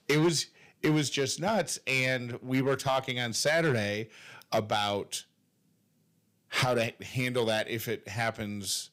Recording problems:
distortion; slight; 4% of the sound clipped

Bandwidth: 15.5 kHz